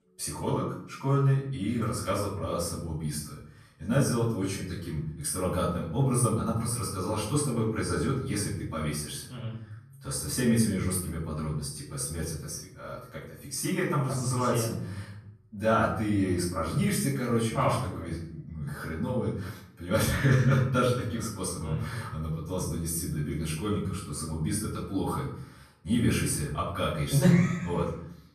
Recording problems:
off-mic speech; far
room echo; noticeable; dies away in 0.6 s

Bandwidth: 13.5 kHz